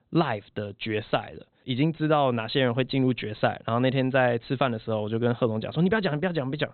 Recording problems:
high frequencies cut off; severe; nothing above 4 kHz

